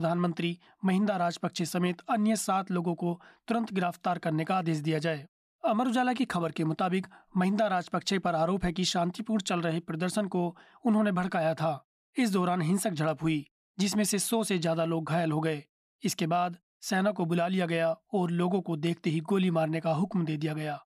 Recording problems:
abrupt cut into speech; at the start

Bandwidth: 14.5 kHz